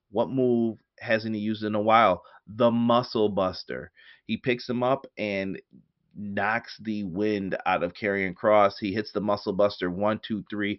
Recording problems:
high frequencies cut off; noticeable; nothing above 5.5 kHz

